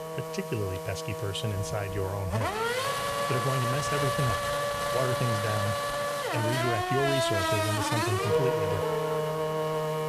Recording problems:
traffic noise; very loud; throughout; 3 dB above the speech
hiss; noticeable; throughout; 15 dB below the speech

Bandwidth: 14.5 kHz